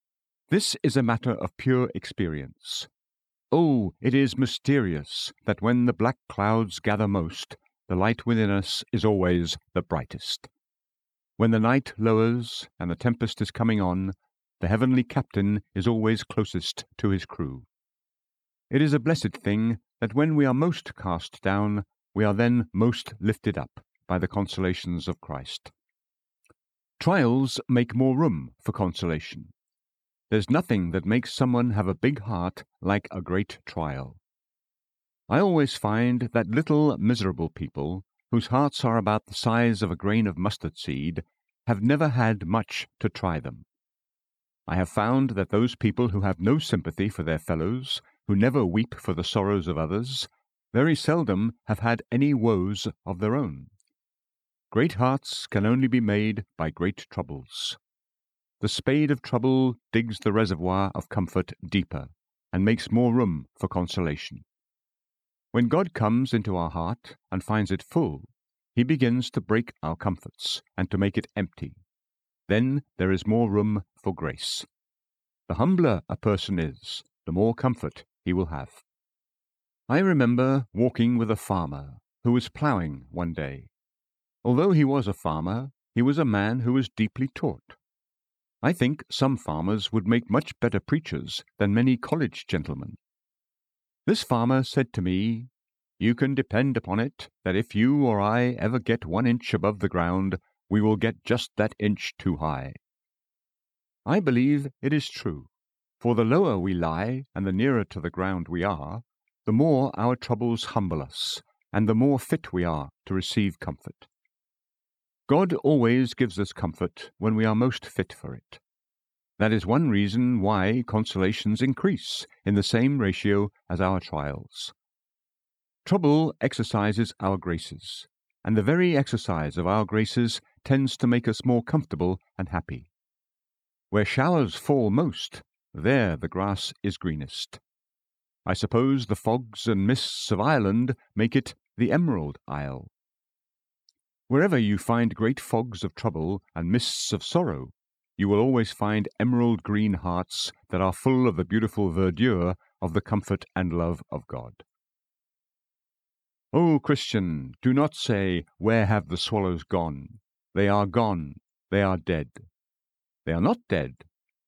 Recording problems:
none

